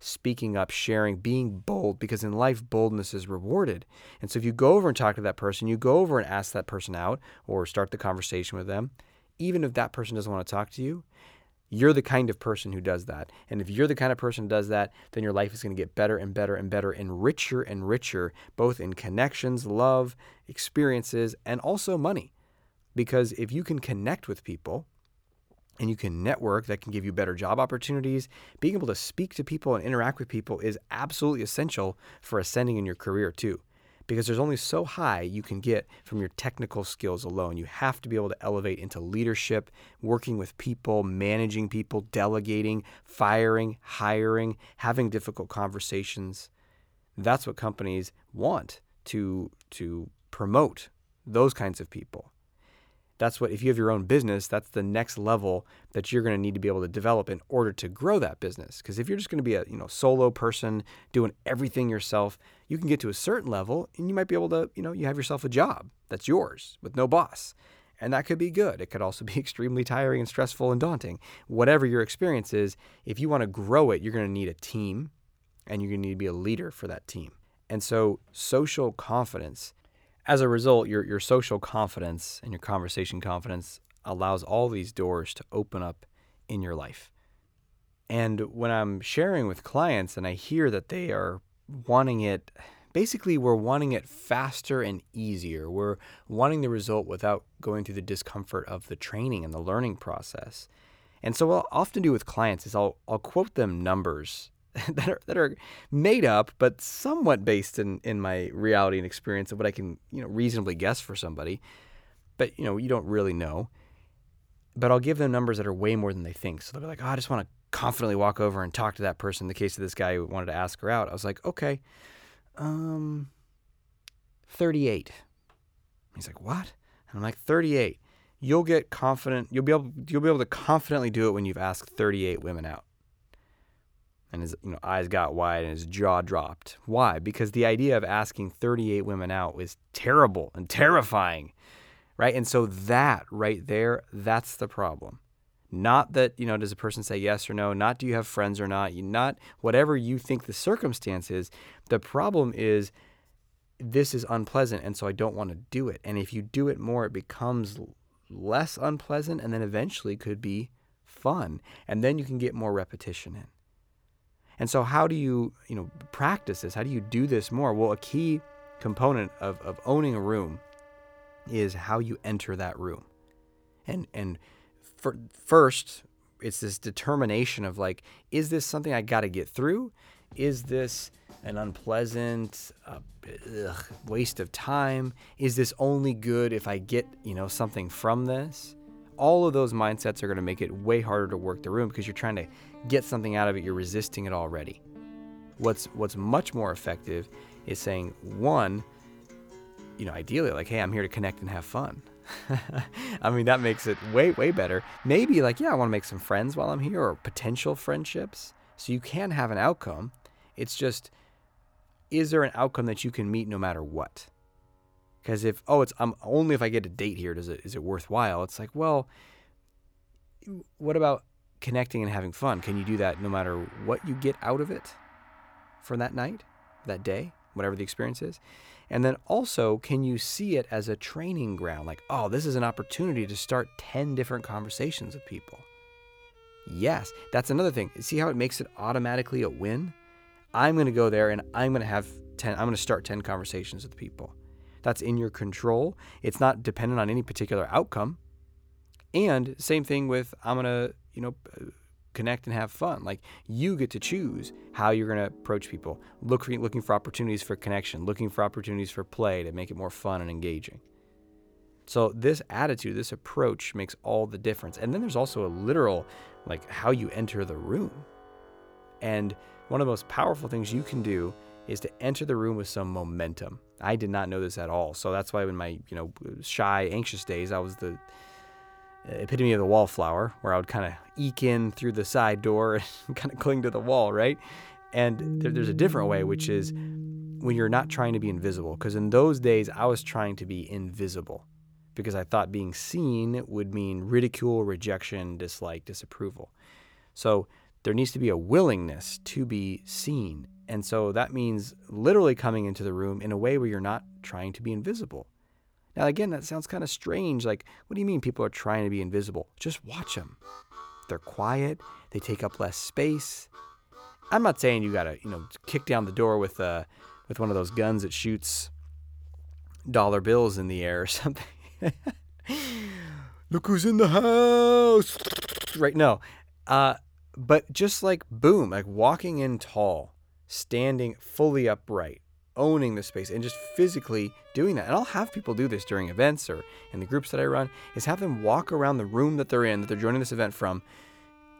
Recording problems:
background music; noticeable; from 2:46 on; 20 dB below the speech

